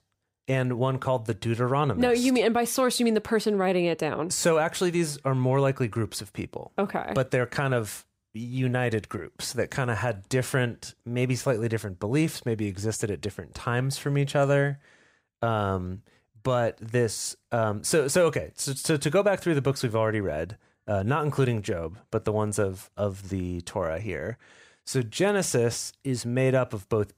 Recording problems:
none

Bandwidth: 15.5 kHz